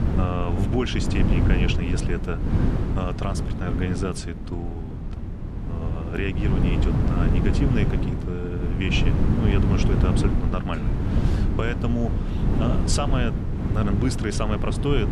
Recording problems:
wind noise on the microphone; heavy; 3 dB below the speech

